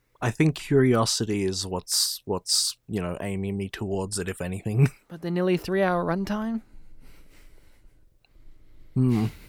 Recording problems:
none

